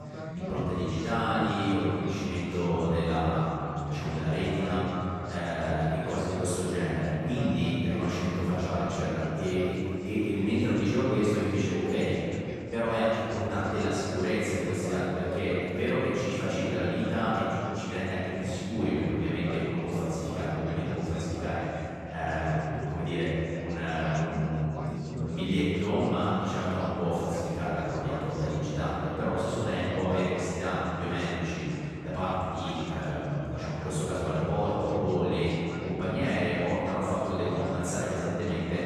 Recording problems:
room echo; strong; dies away in 2.6 s
off-mic speech; far
background chatter; noticeable; throughout; 4 voices, 10 dB below the speech

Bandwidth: 13.5 kHz